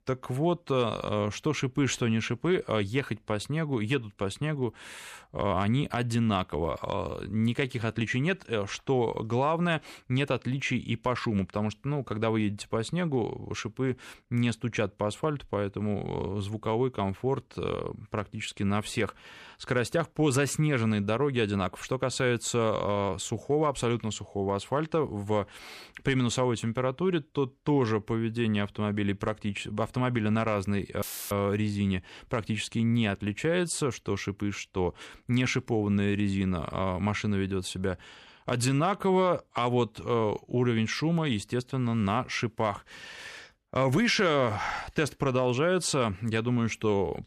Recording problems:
audio cutting out; filled with static; at 31 s

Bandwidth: 14 kHz